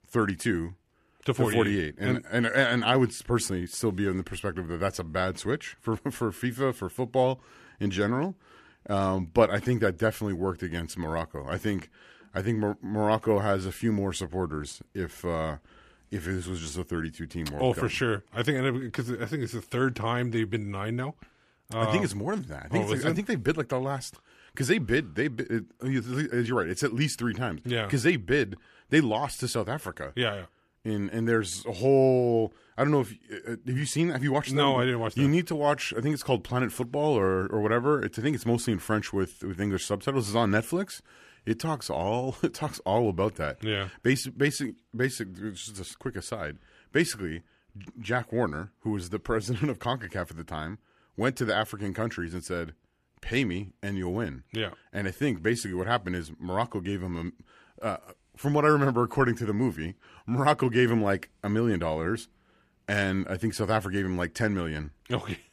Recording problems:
none

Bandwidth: 14.5 kHz